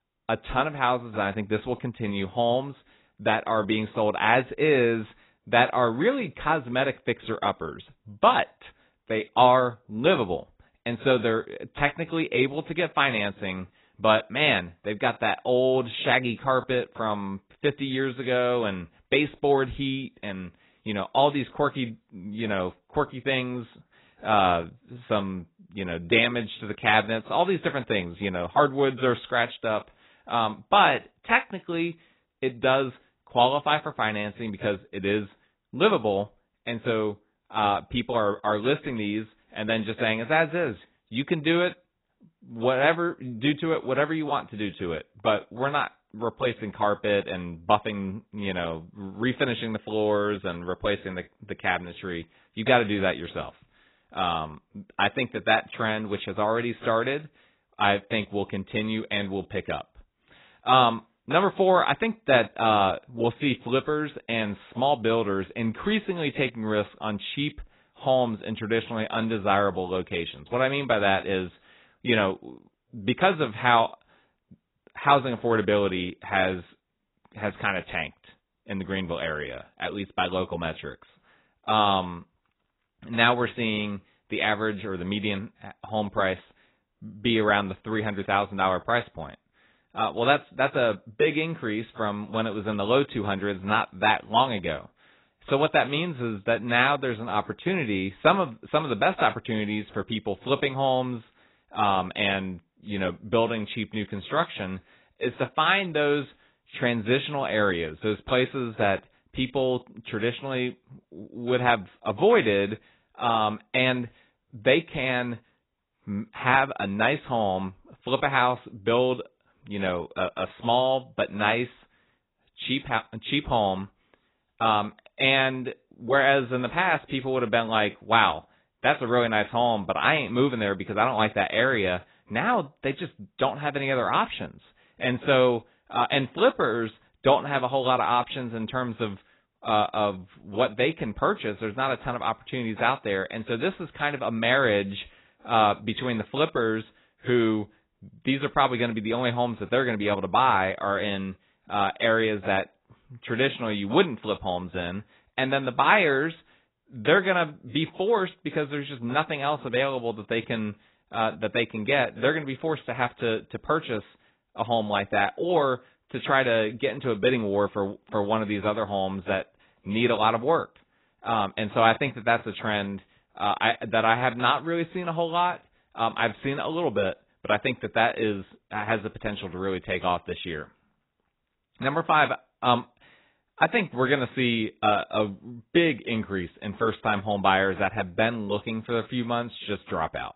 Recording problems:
garbled, watery; badly; nothing above 4 kHz

